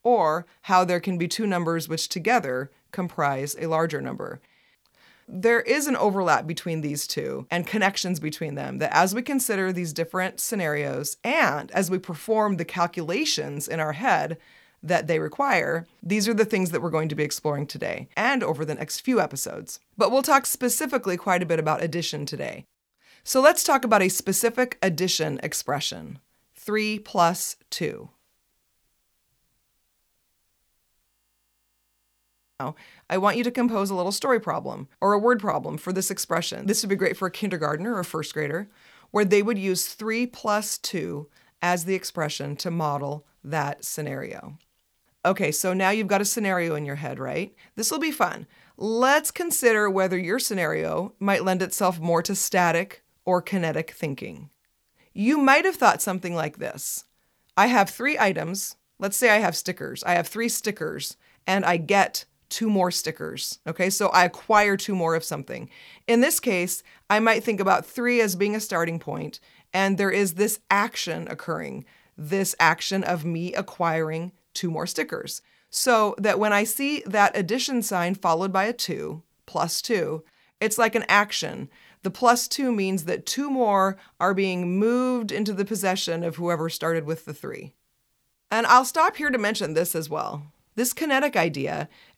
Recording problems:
audio freezing; at 31 s for 1.5 s

